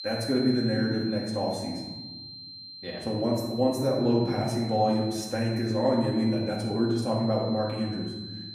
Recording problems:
off-mic speech; far
room echo; noticeable; dies away in 1.2 s
high-pitched whine; noticeable; throughout; 4 kHz, 10 dB below the speech

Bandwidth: 15 kHz